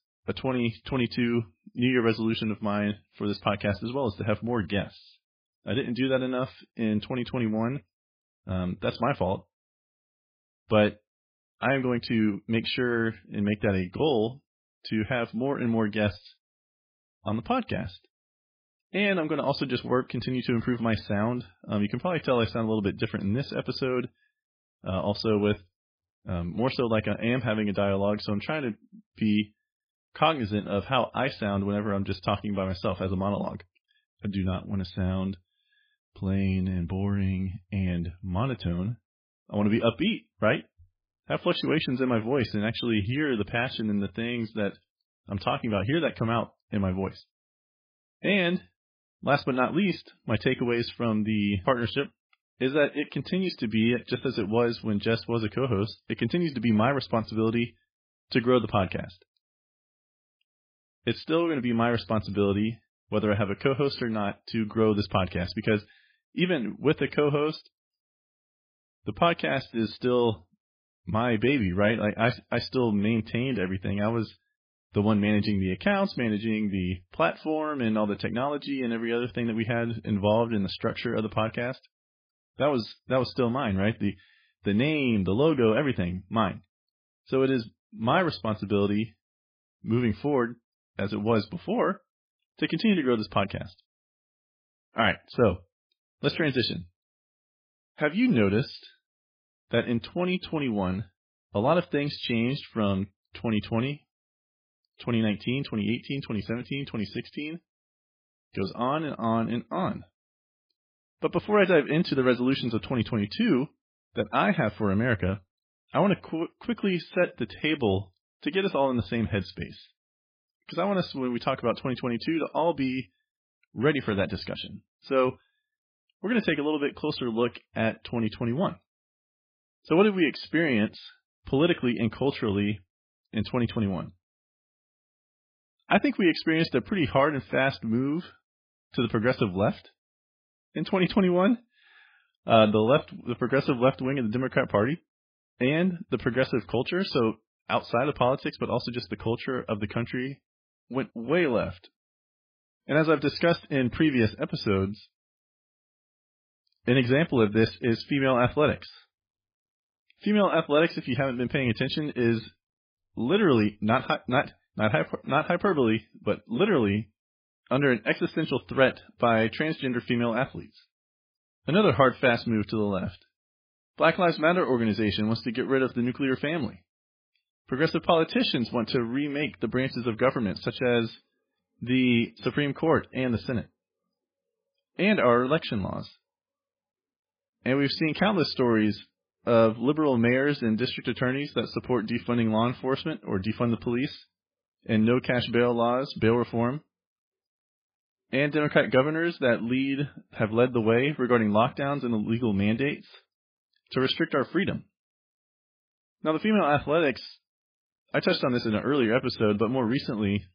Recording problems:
garbled, watery; badly; nothing above 5 kHz

